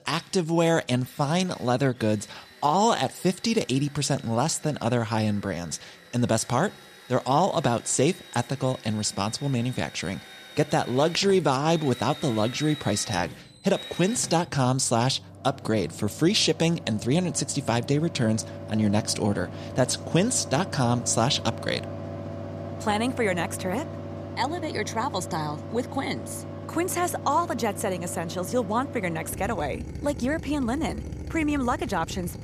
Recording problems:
machinery noise; noticeable; throughout; 15 dB below the speech

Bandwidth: 14.5 kHz